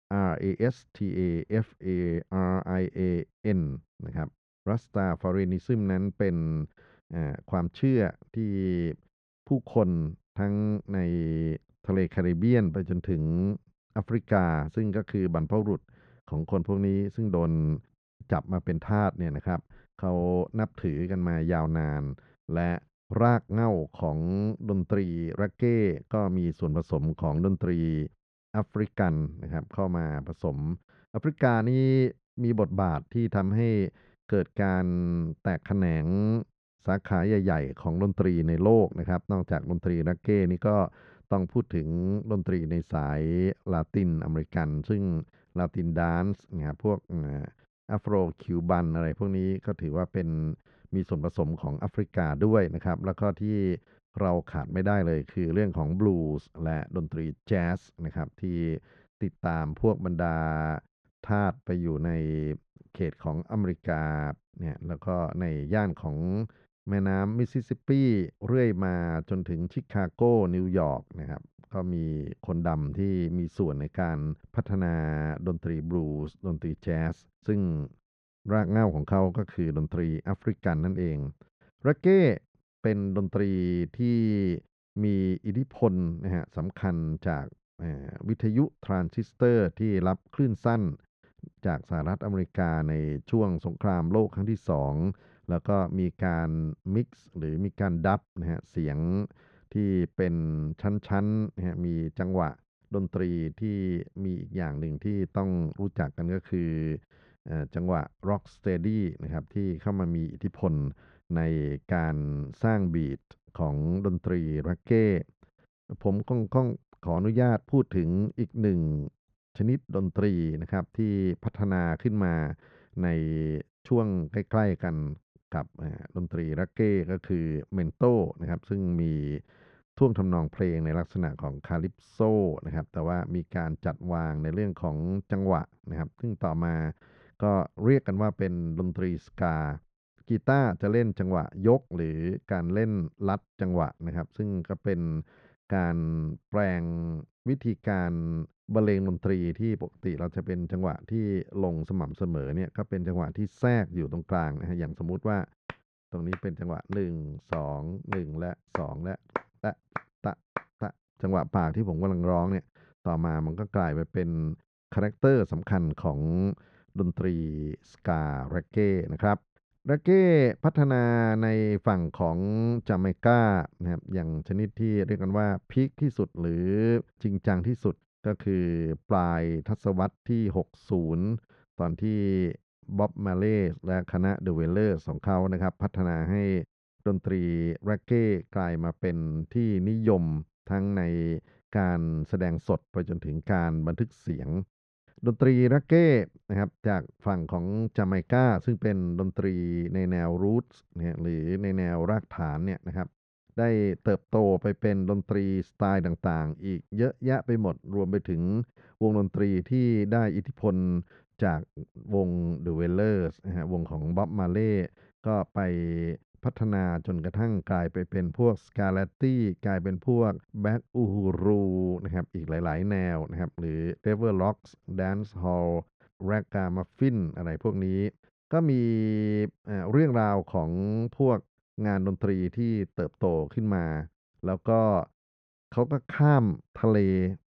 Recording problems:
muffled; very; fading above 1.5 kHz

